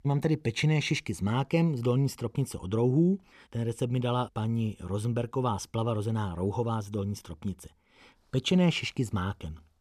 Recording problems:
none

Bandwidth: 14 kHz